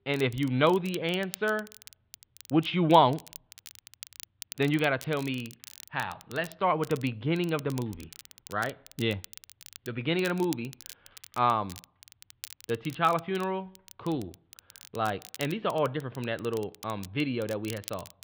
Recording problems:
muffled; slightly; fading above 3.5 kHz
crackle, like an old record; noticeable; 20 dB below the speech

